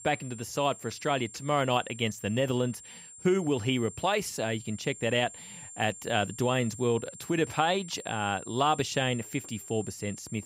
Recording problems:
high-pitched whine; noticeable; throughout; 7.5 kHz, 15 dB below the speech

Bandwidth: 15.5 kHz